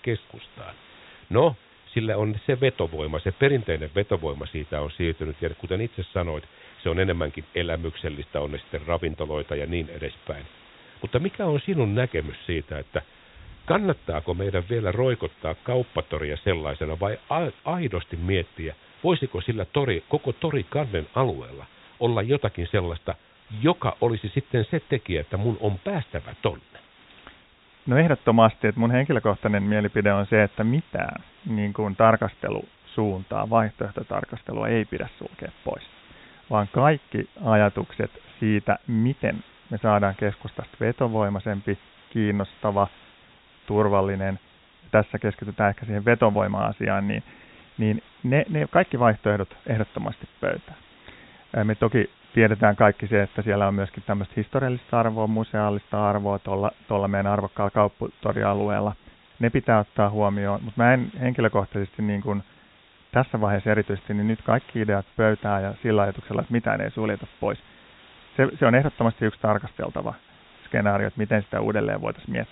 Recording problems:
high frequencies cut off; severe; nothing above 4 kHz
hiss; faint; throughout; 25 dB below the speech

